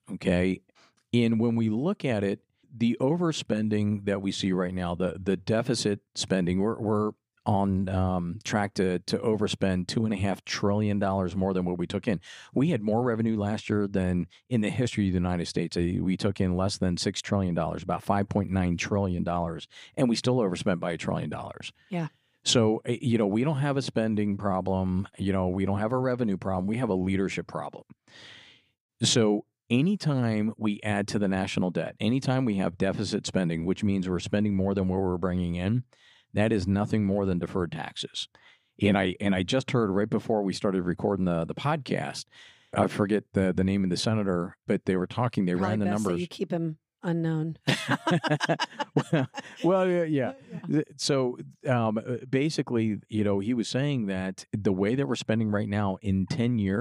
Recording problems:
abrupt cut into speech; at the end

